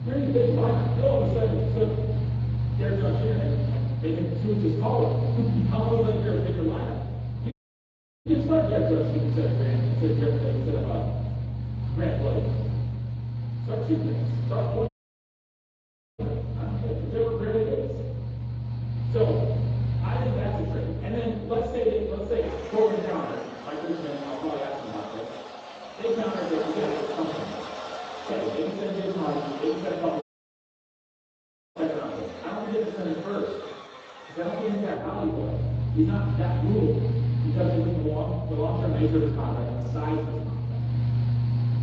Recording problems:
off-mic speech; far
room echo; noticeable; dies away in 1.1 s
garbled, watery; slightly; nothing above 7.5 kHz
muffled; very slightly; fading above 2 kHz
machinery noise; very loud; throughout; as loud as the speech
audio cutting out; at 7.5 s for 0.5 s, at 15 s for 1.5 s and at 30 s for 1.5 s

